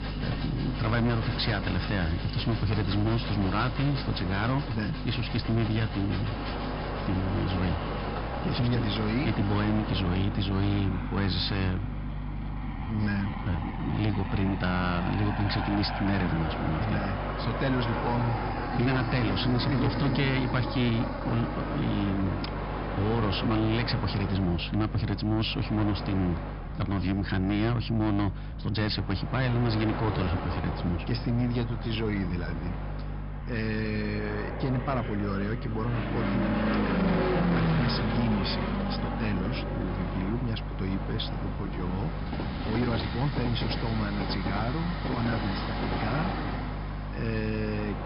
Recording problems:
high frequencies cut off; noticeable; nothing above 5.5 kHz
distortion; slight; 10 dB below the speech
train or aircraft noise; loud; throughout; 5 dB below the speech
electrical hum; noticeable; throughout; 50 Hz, 15 dB below the speech
uneven, jittery; strongly; from 4.5 to 45 s

